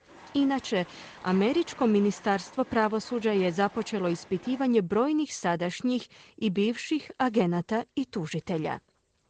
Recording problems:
garbled, watery; slightly
animal sounds; faint; throughout; 20 dB below the speech

